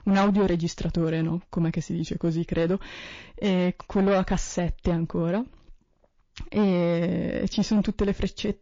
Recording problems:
distortion; slight; 10 dB below the speech
garbled, watery; slightly

